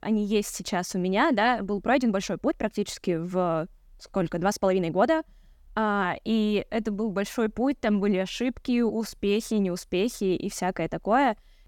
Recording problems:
uneven, jittery; strongly; from 2 to 9 s

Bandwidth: 18 kHz